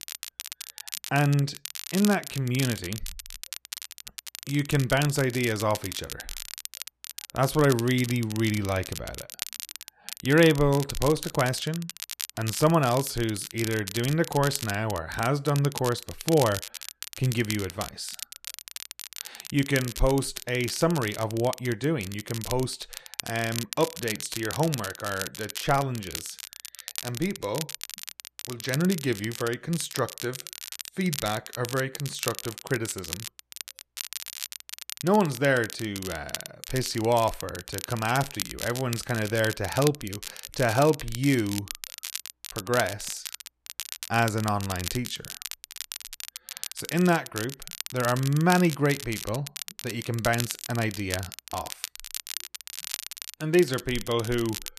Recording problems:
crackle, like an old record; loud; 9 dB below the speech

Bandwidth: 14 kHz